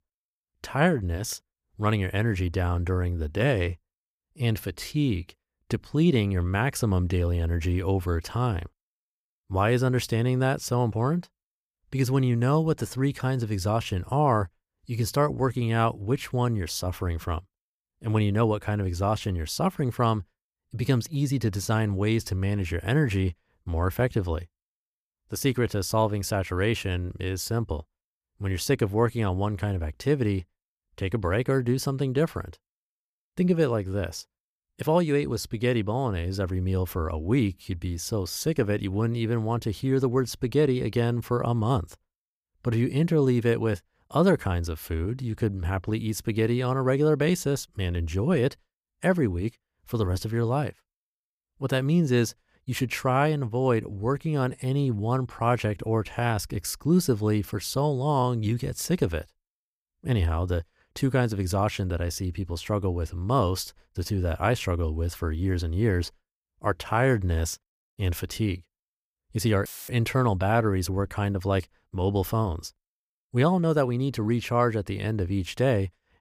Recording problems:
audio cutting out; filled with static; at 1:10

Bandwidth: 15 kHz